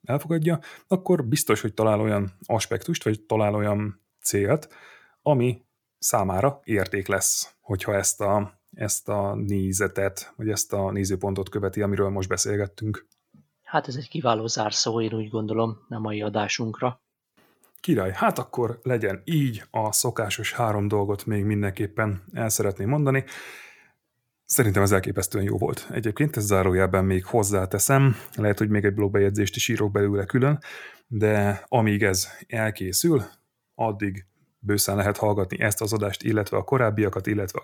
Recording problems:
none

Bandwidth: 19 kHz